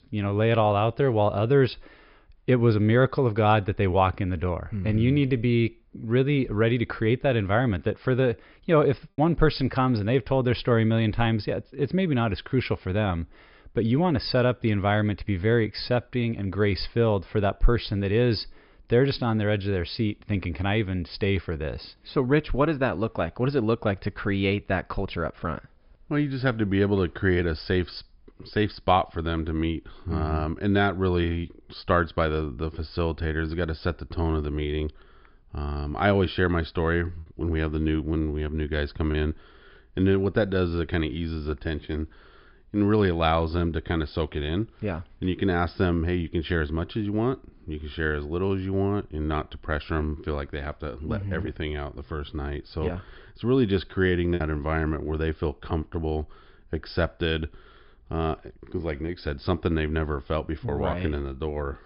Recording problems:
high frequencies cut off; noticeable; nothing above 5.5 kHz
choppy; occasionally; under 1% of the speech affected

